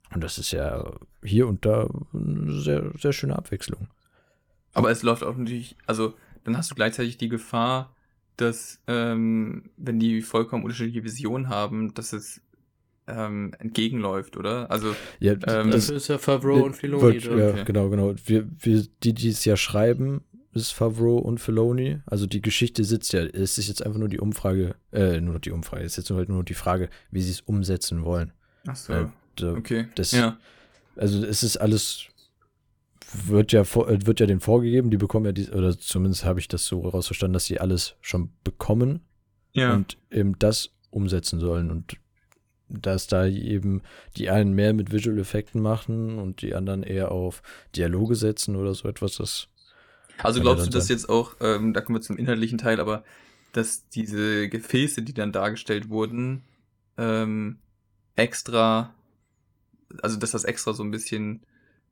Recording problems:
none

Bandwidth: 19 kHz